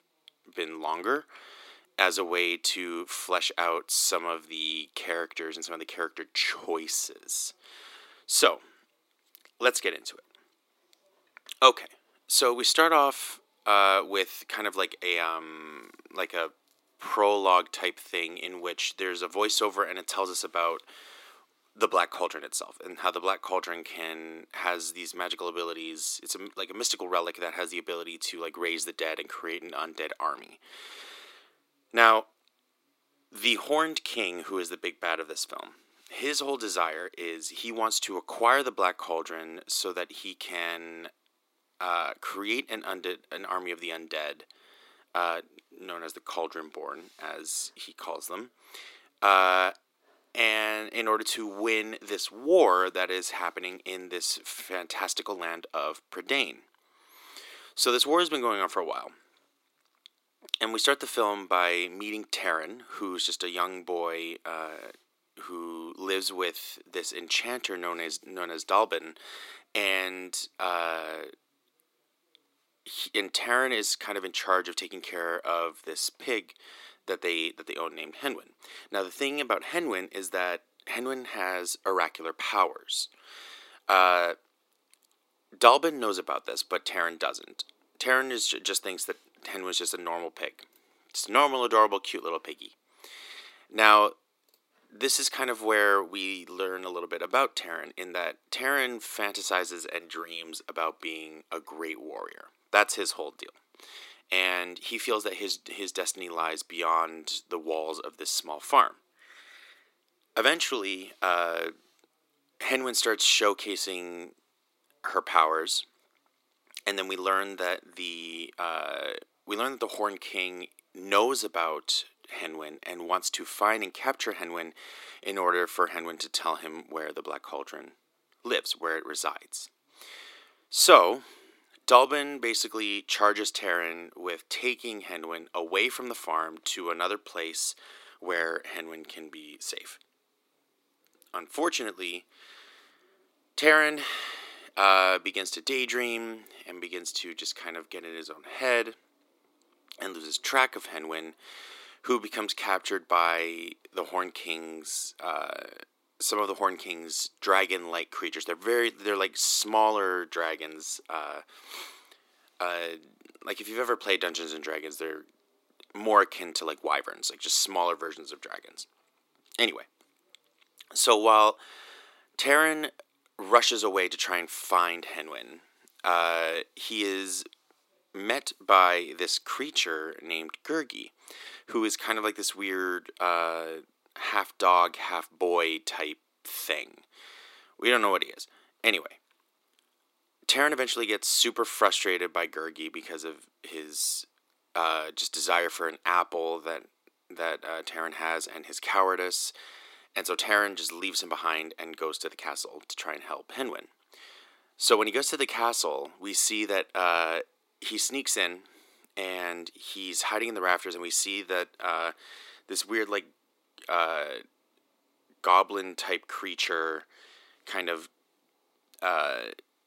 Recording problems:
thin; very; fading below 300 Hz

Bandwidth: 16 kHz